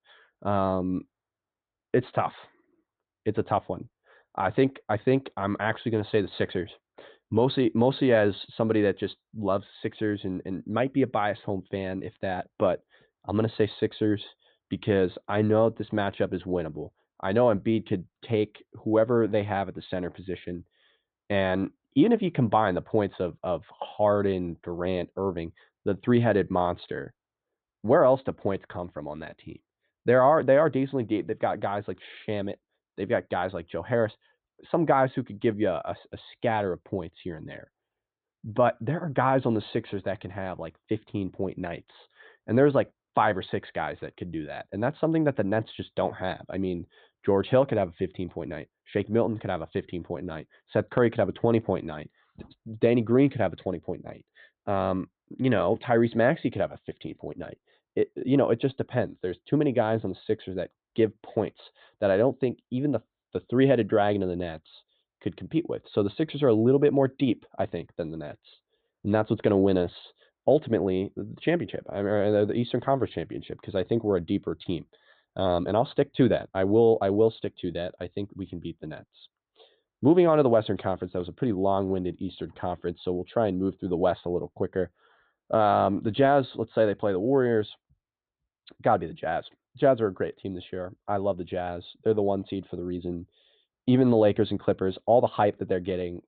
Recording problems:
high frequencies cut off; severe; nothing above 4 kHz

